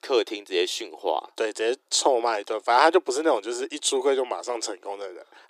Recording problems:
thin; very; fading below 350 Hz

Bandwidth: 15 kHz